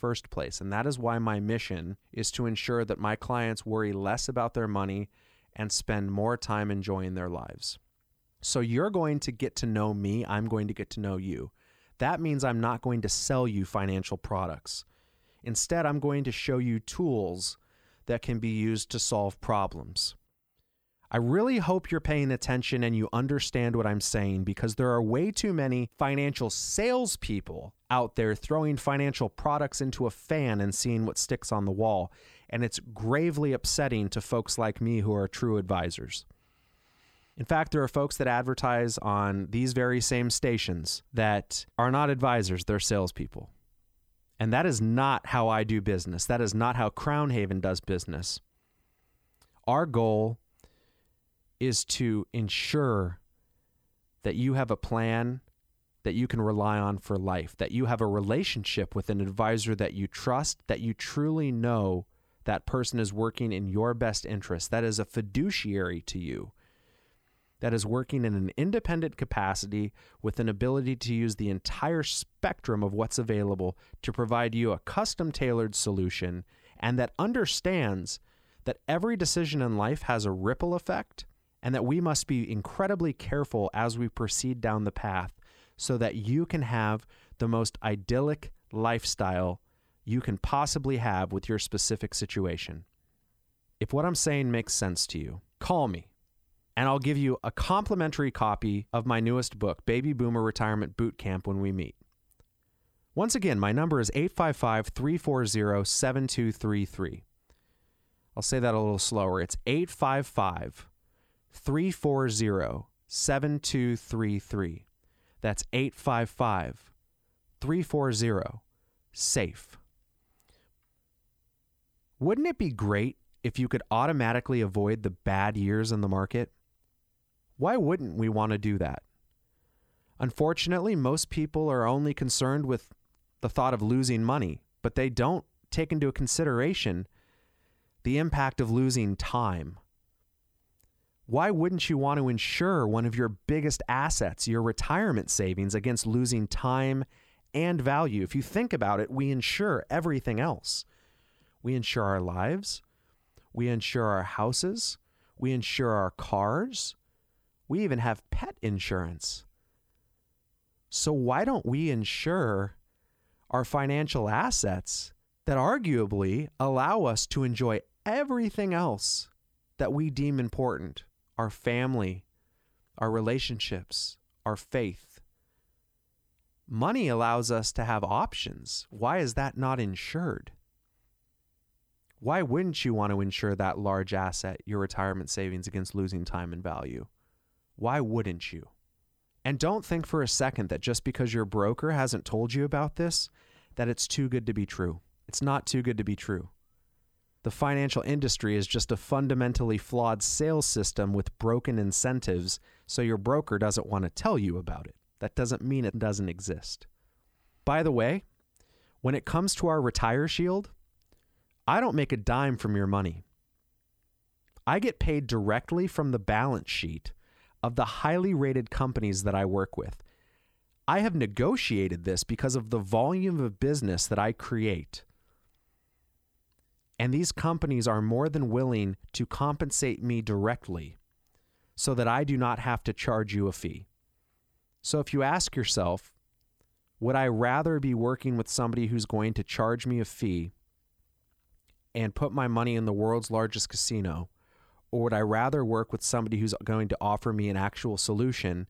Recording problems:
none

